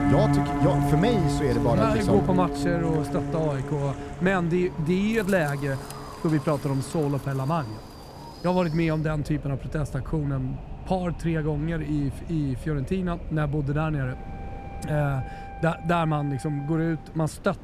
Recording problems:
background music; loud; throughout; 3 dB below the speech
wind in the background; noticeable; throughout; 15 dB below the speech

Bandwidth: 14.5 kHz